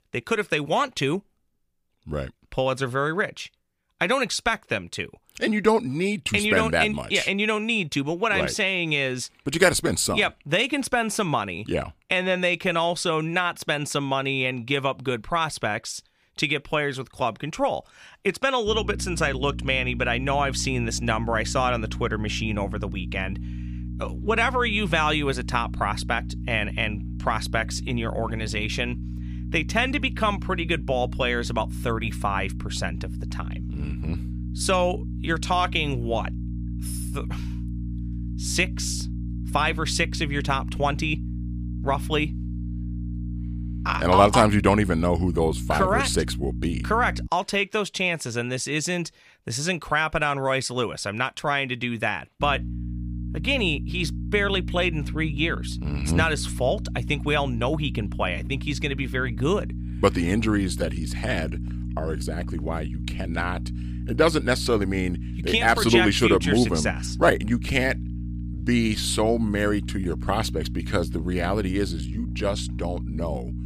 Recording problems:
electrical hum; noticeable; from 19 to 47 s and from 52 s on; 60 Hz, 20 dB below the speech

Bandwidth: 15 kHz